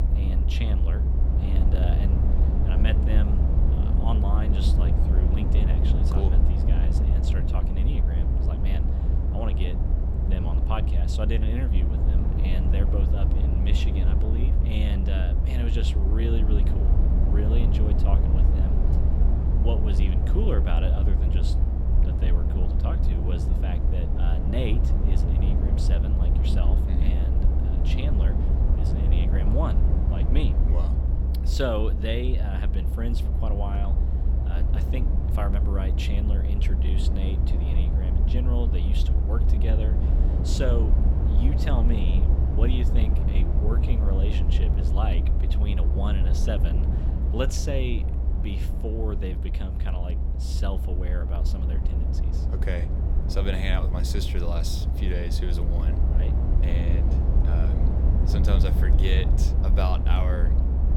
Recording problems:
low rumble; loud; throughout; 2 dB below the speech

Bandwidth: 17.5 kHz